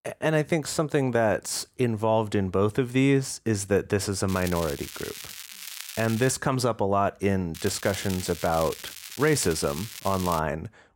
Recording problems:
crackling; noticeable; from 4.5 to 6.5 s and from 7.5 to 10 s; 10 dB below the speech

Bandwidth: 16.5 kHz